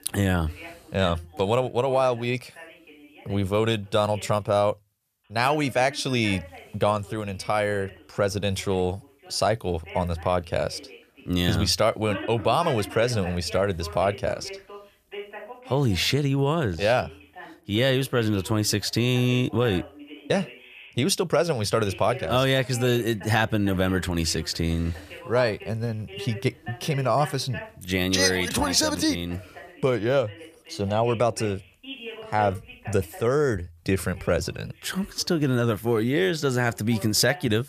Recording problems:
voice in the background; noticeable; throughout; 15 dB below the speech

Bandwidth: 14.5 kHz